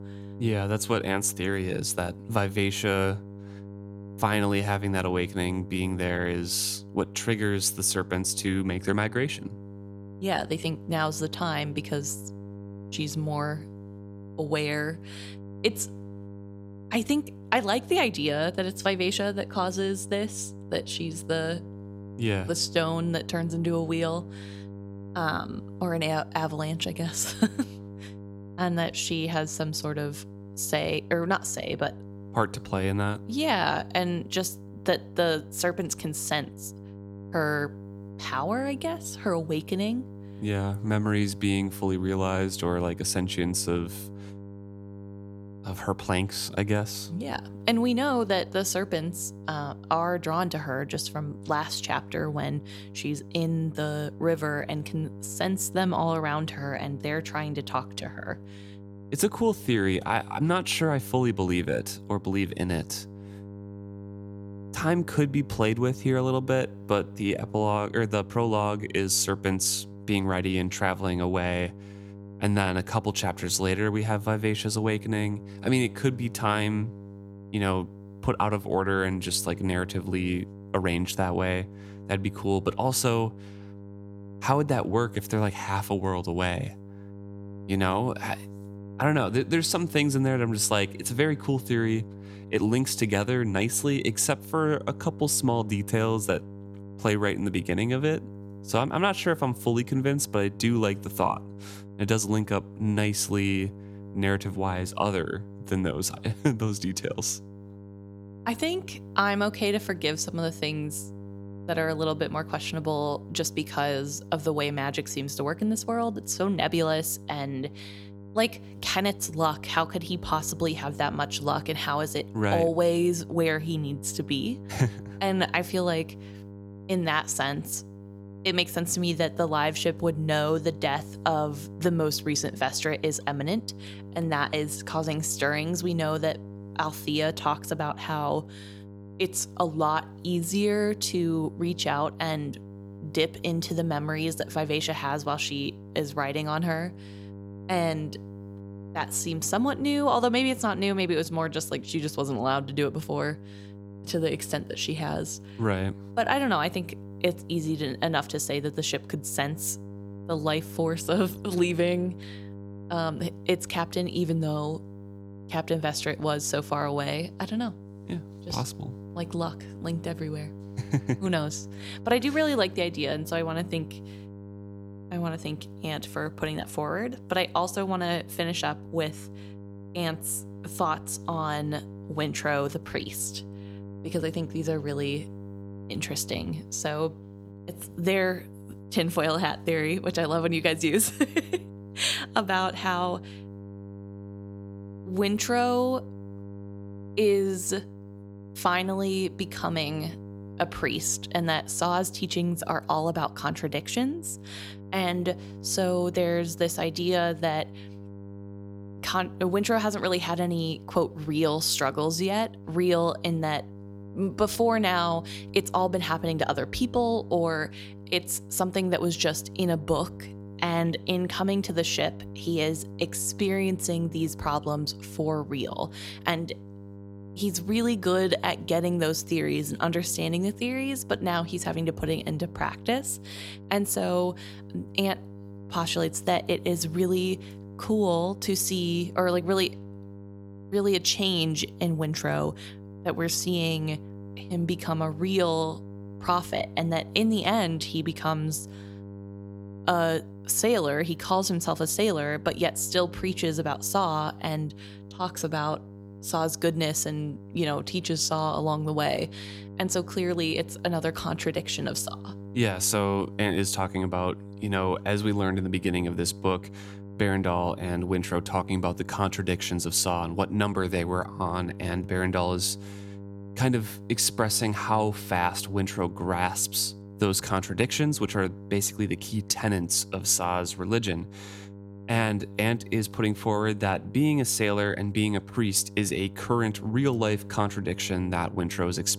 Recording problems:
electrical hum; faint; throughout; 50 Hz, 20 dB below the speech

